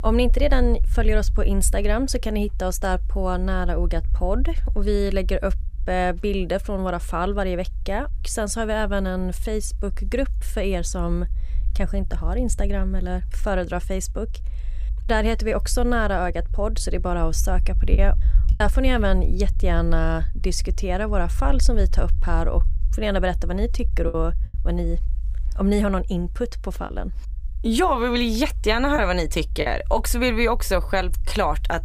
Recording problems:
low rumble; faint; throughout; 25 dB below the speech
choppy; occasionally; at 18 s, from 24 to 27 s and at 29 s; 5% of the speech affected

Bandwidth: 15 kHz